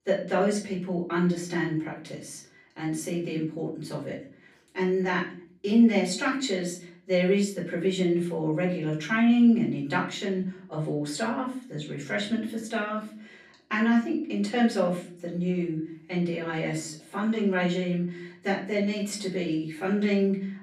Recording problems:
off-mic speech; far
room echo; slight; dies away in 0.5 s

